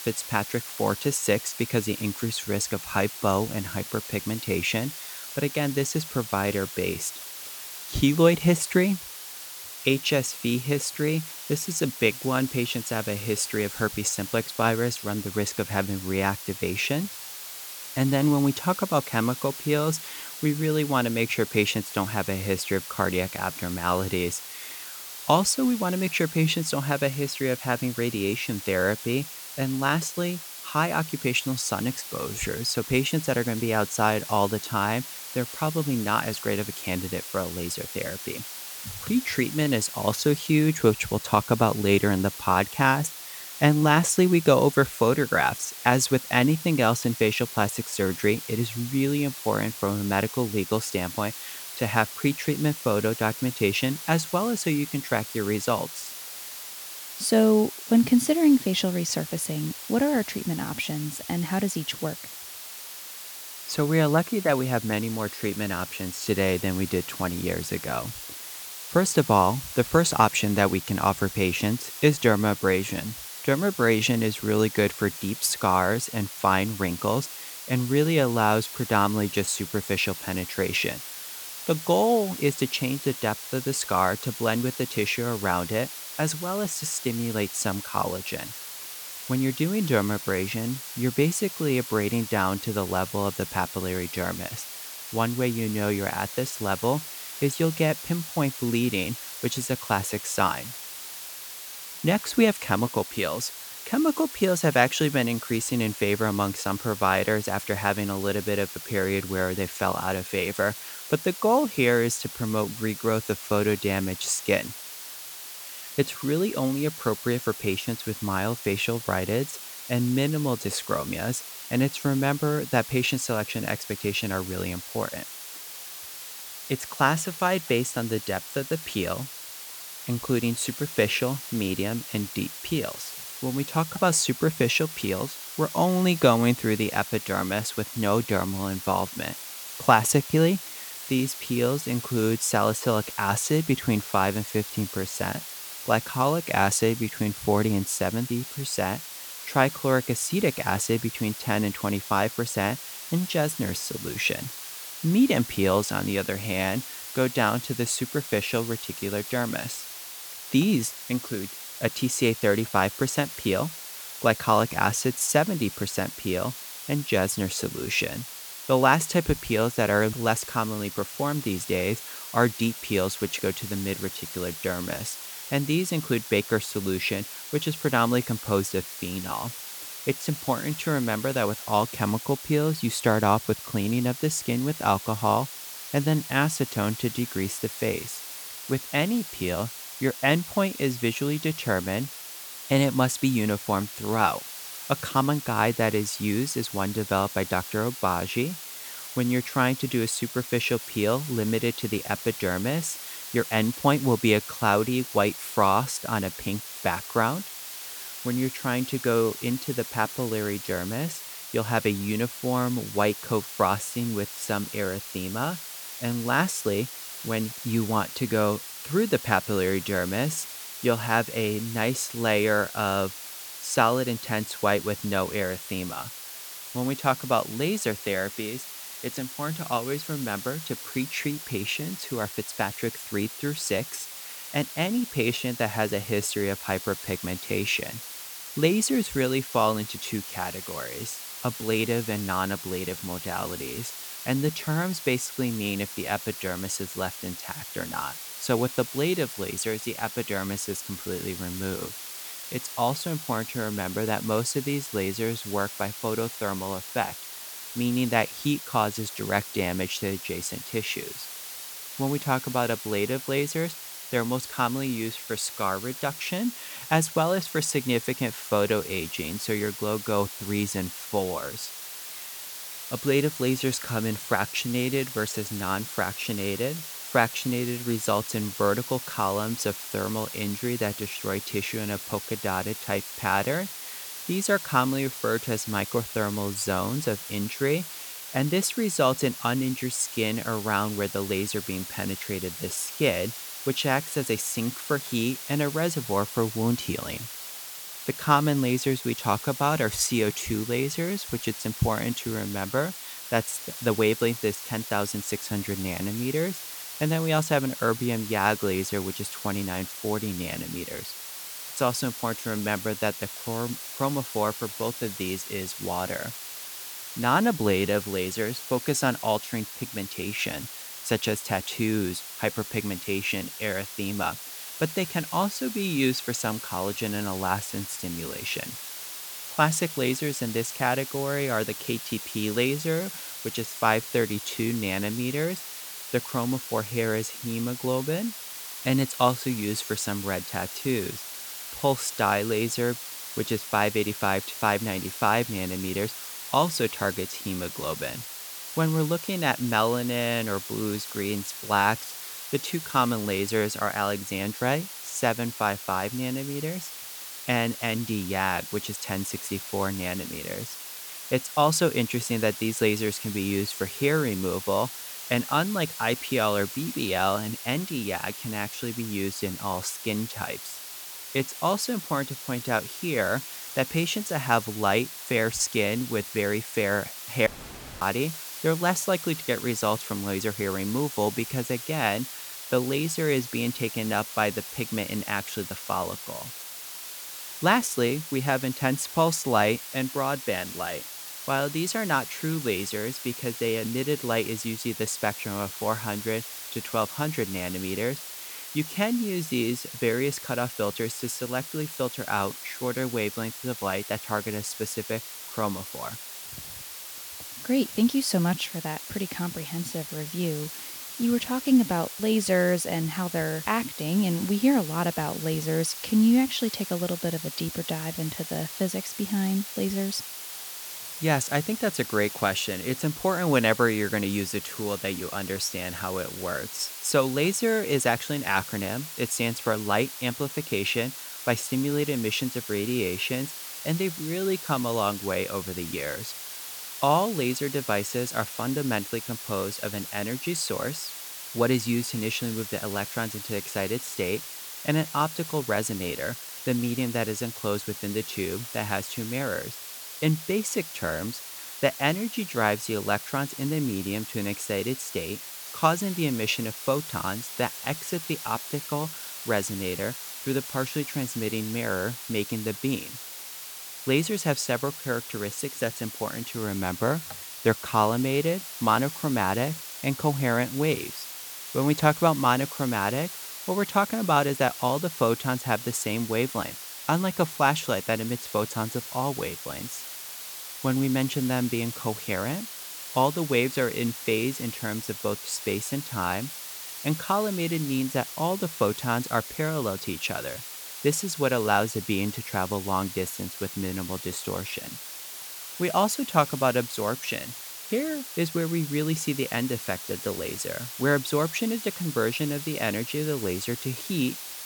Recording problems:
hiss; loud; throughout; 9 dB below the speech
audio cutting out; at 6:17 for 0.5 s

